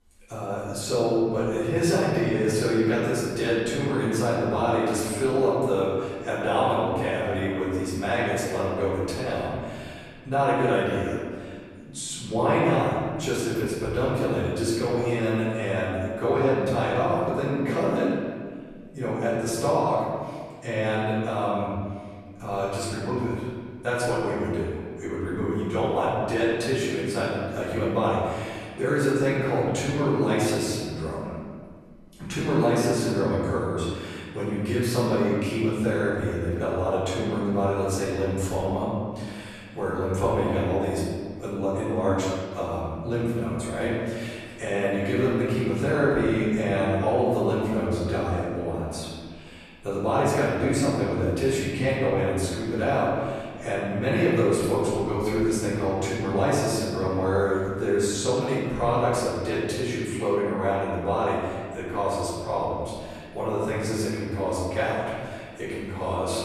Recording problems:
room echo; strong; dies away in 1.8 s
off-mic speech; far

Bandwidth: 13.5 kHz